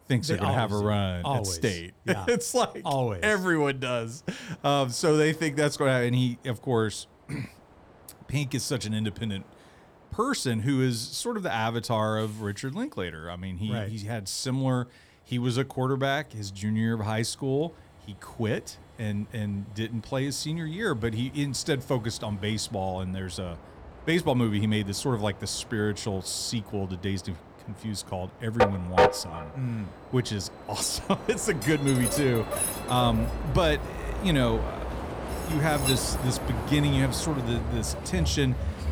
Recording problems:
train or aircraft noise; loud; throughout; 3 dB below the speech

